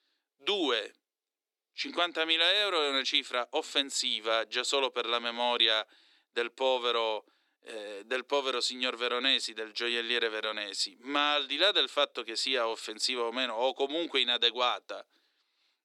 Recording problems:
thin; somewhat; fading below 300 Hz

